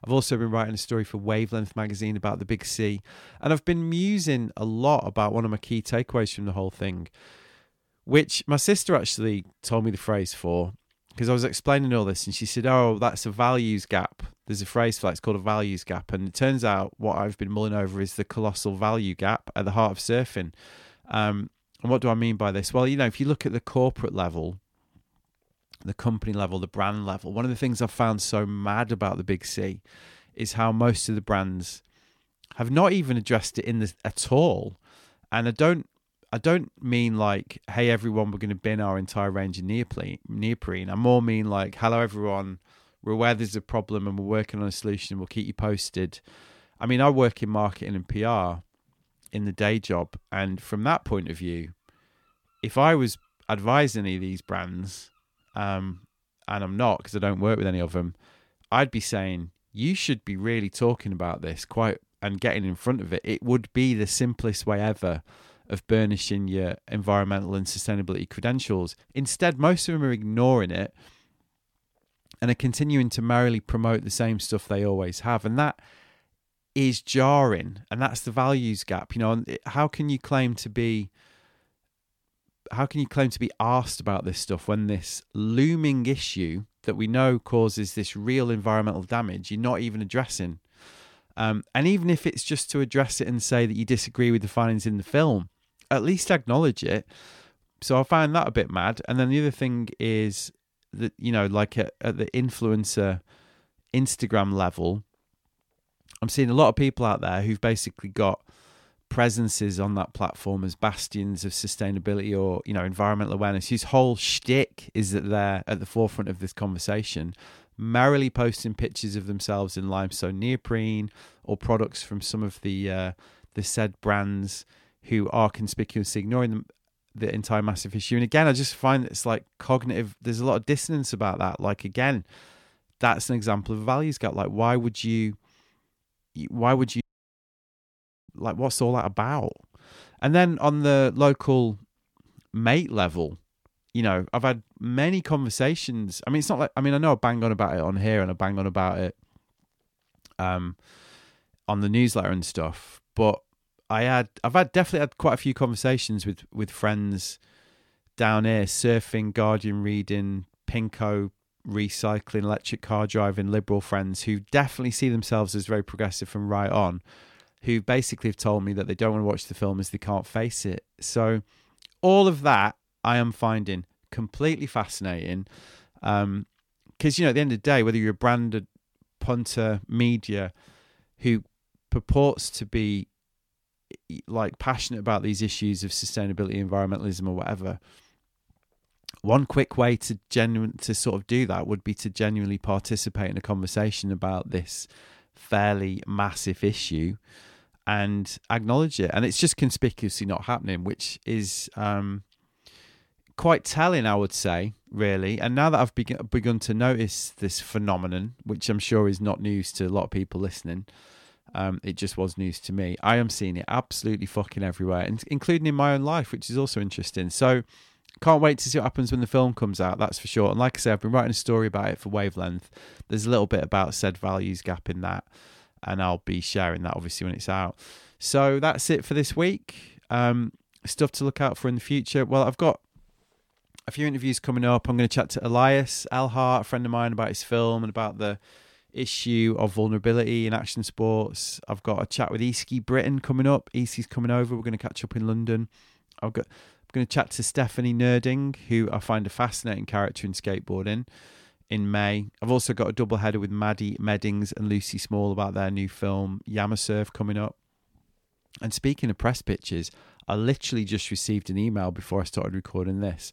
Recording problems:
audio cutting out; at 2:17 for 1.5 s

